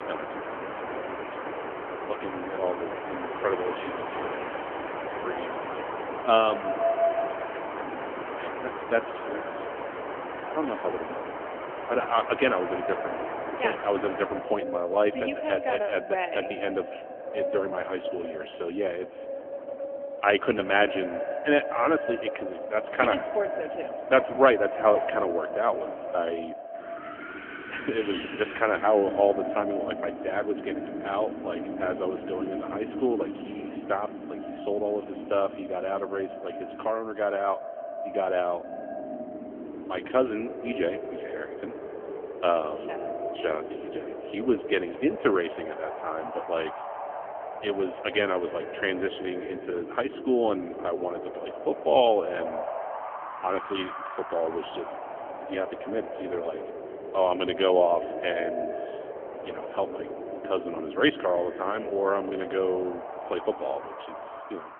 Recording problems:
phone-call audio; poor line; nothing above 3.5 kHz
echo of what is said; strong; throughout; 150 ms later, 10 dB below the speech
wind in the background; loud; throughout; 8 dB below the speech

